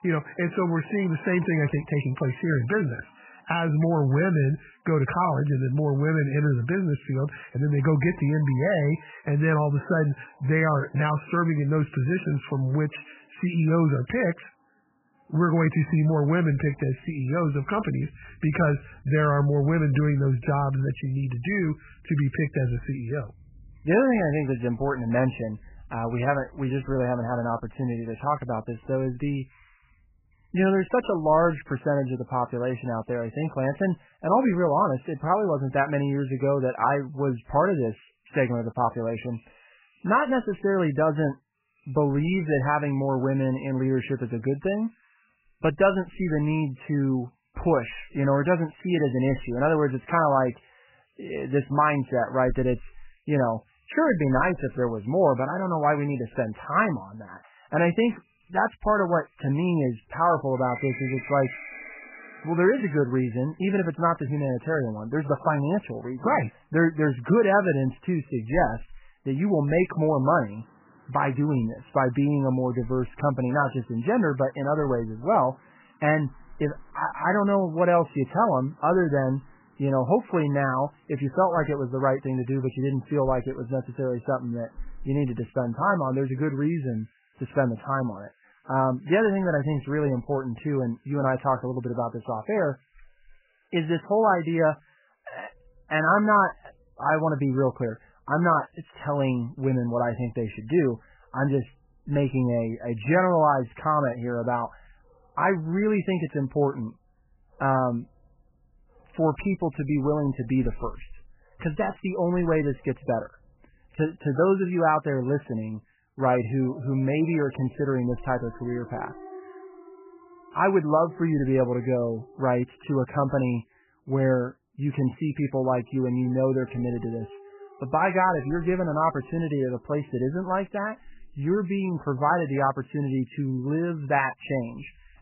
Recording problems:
garbled, watery; badly; nothing above 3 kHz
animal sounds; faint; throughout; 25 dB below the speech

